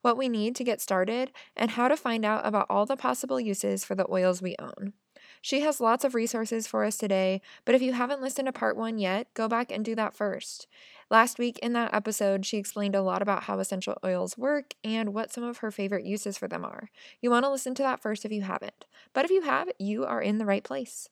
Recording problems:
none

